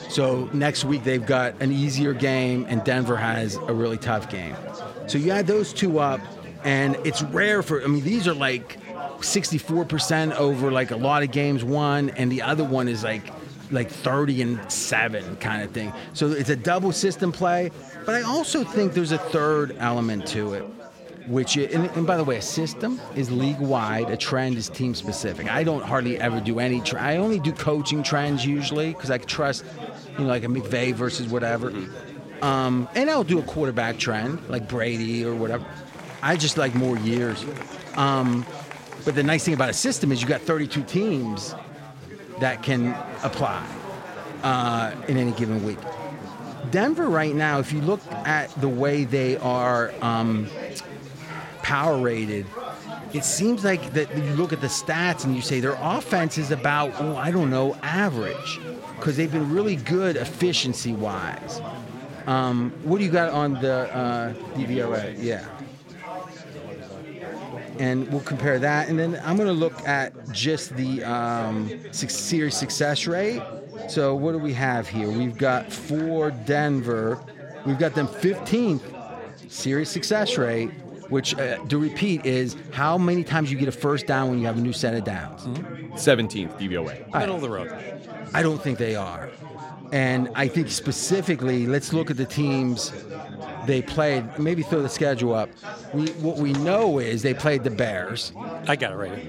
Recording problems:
chatter from many people; noticeable; throughout; 15 dB below the speech

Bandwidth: 16 kHz